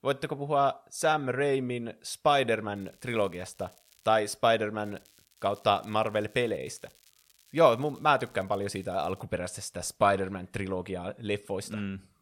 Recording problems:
crackling; faint; from 3 to 4 s and from 5 to 9 s; 30 dB below the speech

